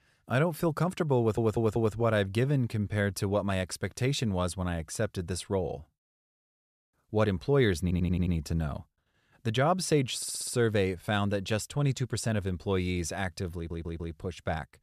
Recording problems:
audio stuttering; 4 times, first at 1 s

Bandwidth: 14.5 kHz